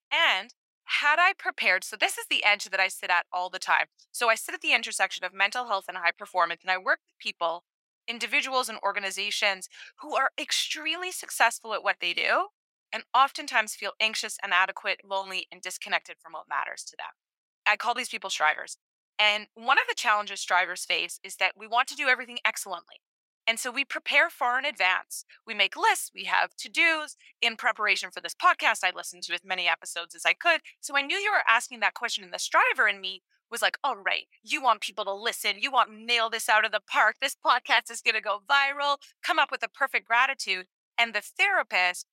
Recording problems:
thin; very; fading below 800 Hz

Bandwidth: 16 kHz